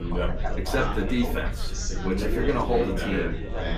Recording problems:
off-mic speech; far
echo of what is said; faint; throughout; 310 ms later, 20 dB below the speech
room echo; very slight; dies away in 0.2 s
chatter from many people; loud; throughout; 3 dB below the speech
low rumble; faint; throughout; 20 dB below the speech

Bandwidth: 15 kHz